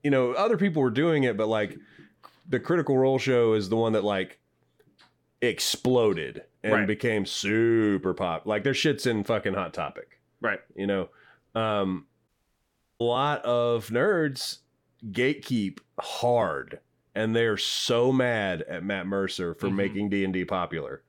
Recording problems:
audio cutting out; at 12 s for 0.5 s

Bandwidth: 17.5 kHz